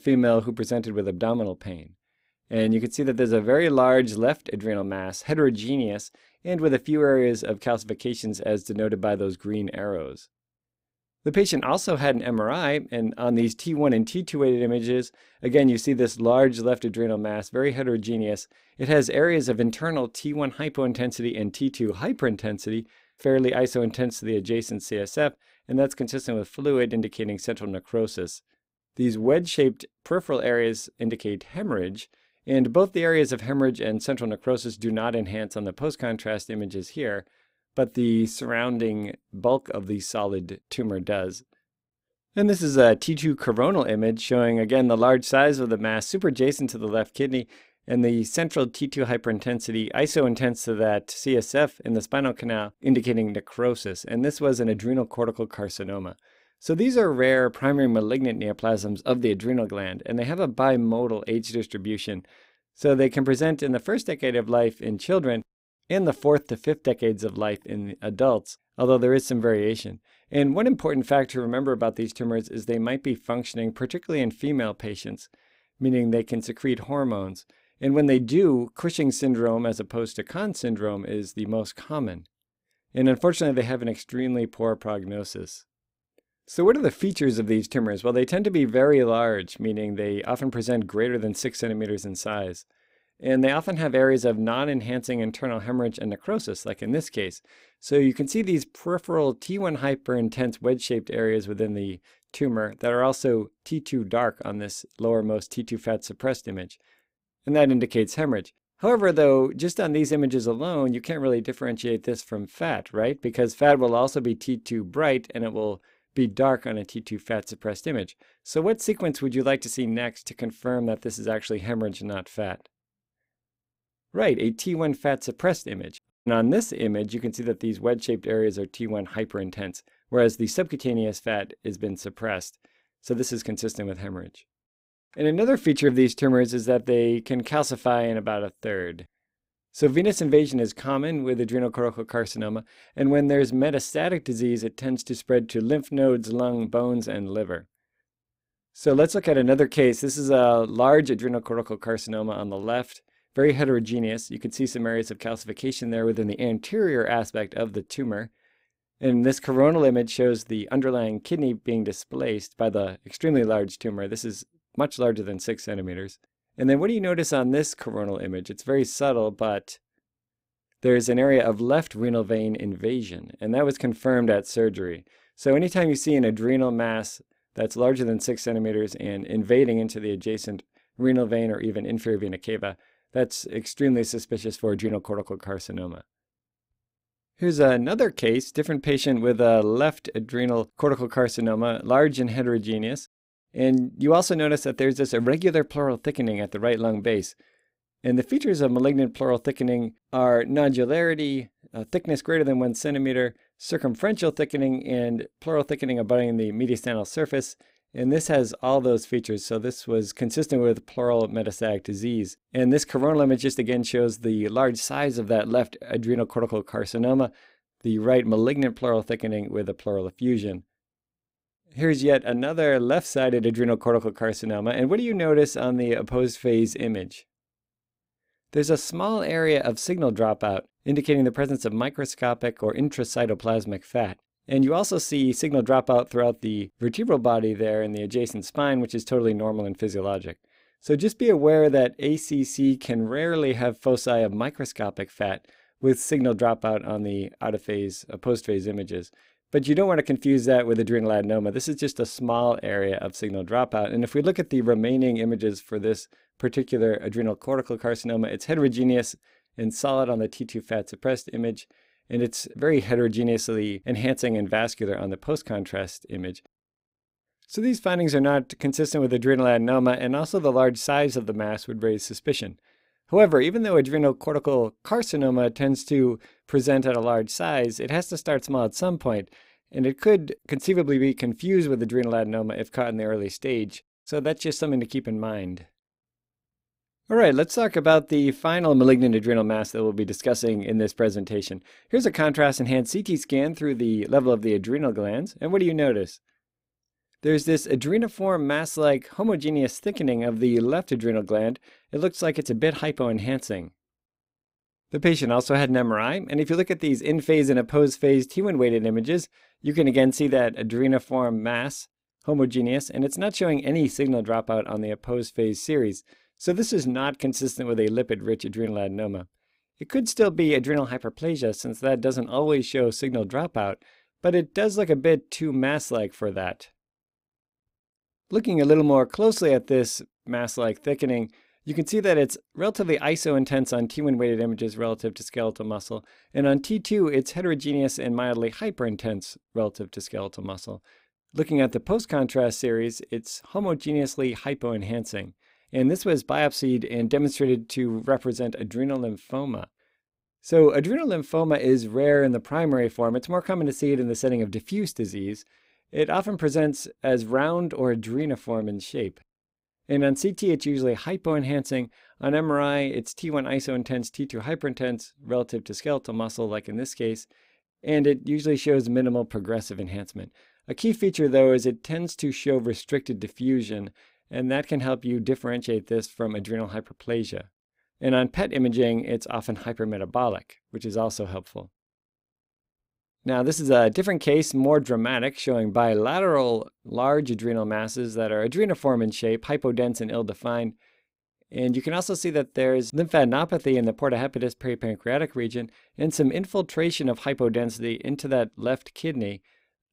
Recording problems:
none

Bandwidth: 15.5 kHz